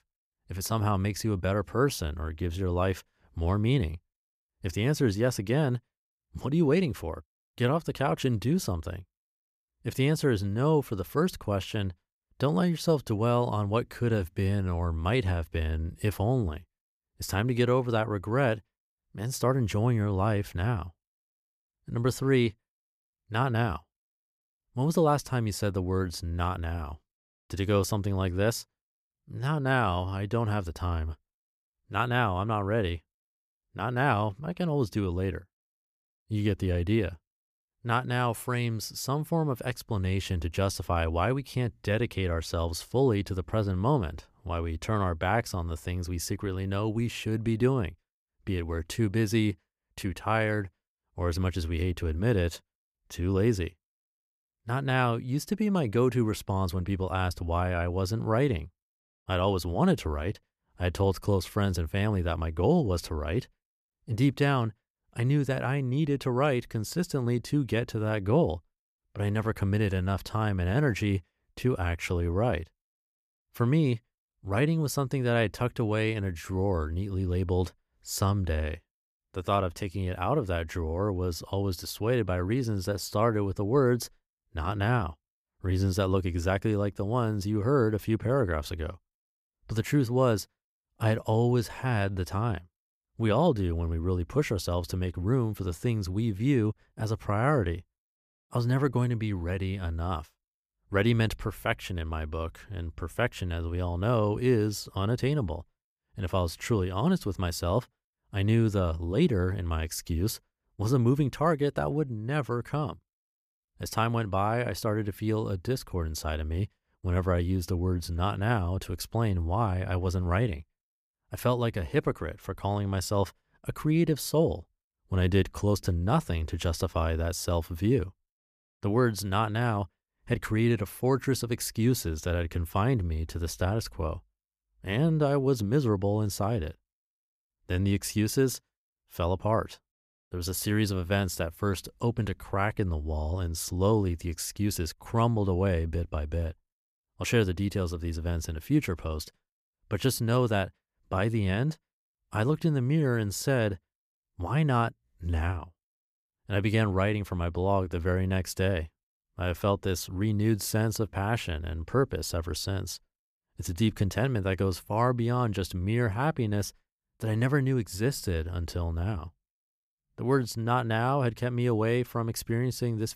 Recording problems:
none

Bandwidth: 14.5 kHz